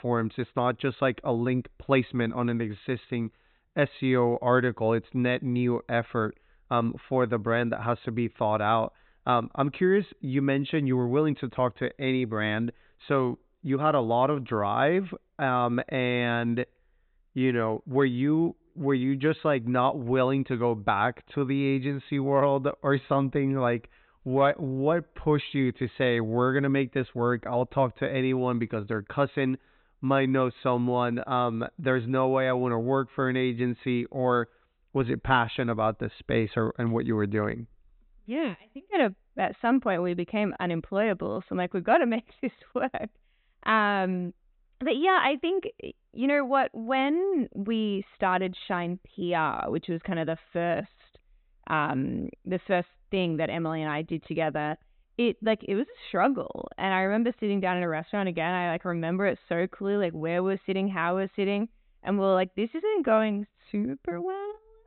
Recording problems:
high frequencies cut off; severe; nothing above 4 kHz

